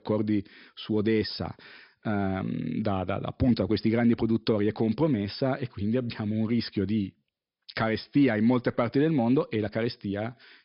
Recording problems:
high frequencies cut off; noticeable; nothing above 5.5 kHz

